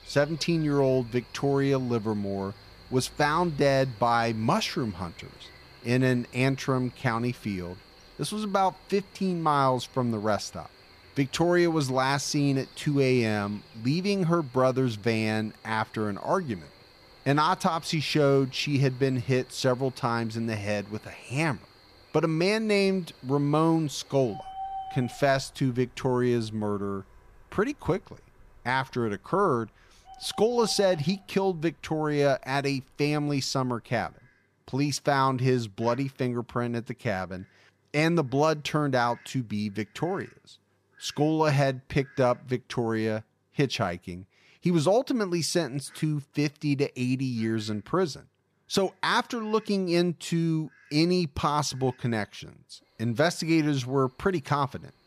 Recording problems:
animal sounds; faint; throughout; 25 dB below the speech

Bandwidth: 14.5 kHz